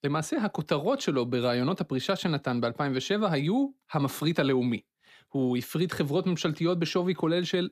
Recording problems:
none

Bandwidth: 15 kHz